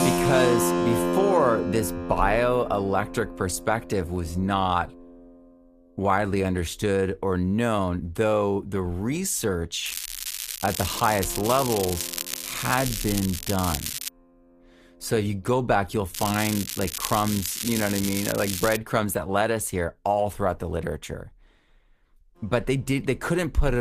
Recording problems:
garbled, watery; slightly; nothing above 14.5 kHz
background music; loud; throughout; 4 dB below the speech
crackling; loud; from 10 to 14 s and from 16 to 19 s; 5 dB below the speech
abrupt cut into speech; at the end

